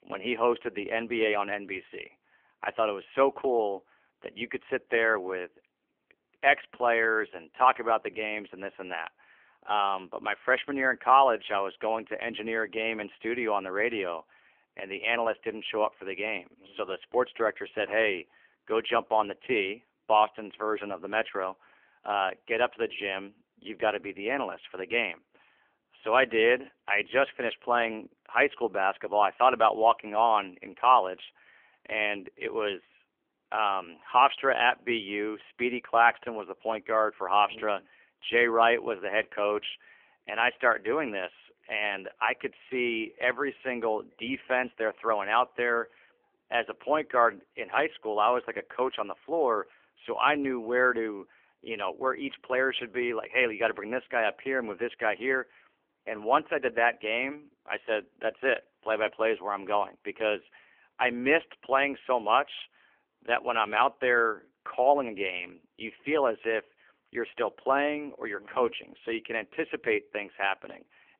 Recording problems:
phone-call audio; poor line; nothing above 3 kHz

